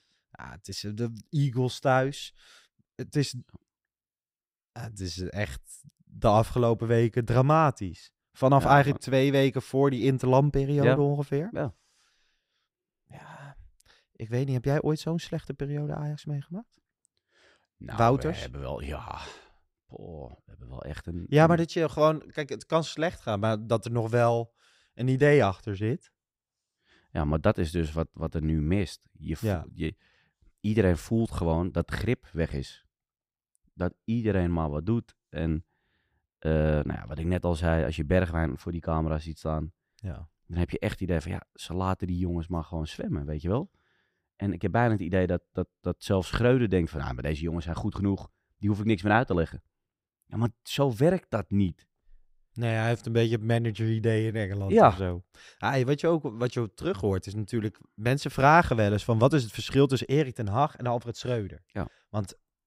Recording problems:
none

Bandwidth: 15.5 kHz